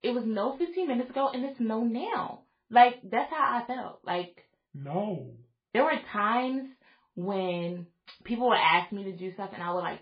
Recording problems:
garbled, watery; badly; nothing above 4.5 kHz
room echo; very slight; dies away in 0.3 s
off-mic speech; somewhat distant

